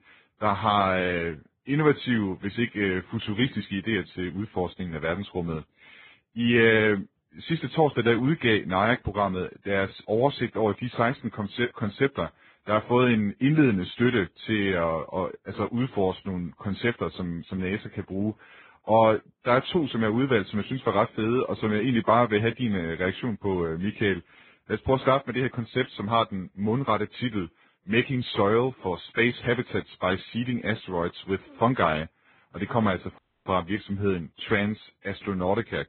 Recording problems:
garbled, watery; badly
high frequencies cut off; severe; nothing above 4 kHz
audio cutting out; at 33 s

